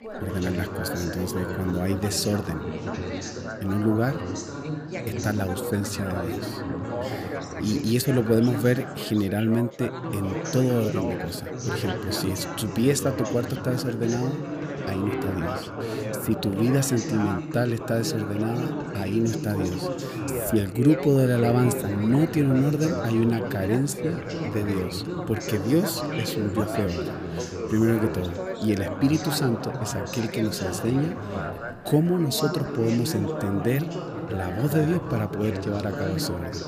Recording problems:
background chatter; loud; throughout; 4 voices, 5 dB below the speech

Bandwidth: 15 kHz